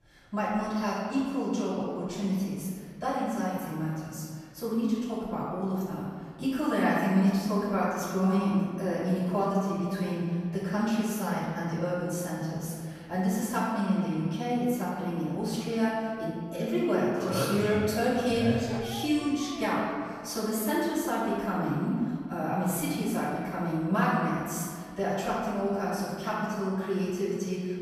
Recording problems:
room echo; strong; dies away in 1.9 s
off-mic speech; far
dog barking; noticeable; from 19 to 20 s; peak 9 dB below the speech

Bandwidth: 14 kHz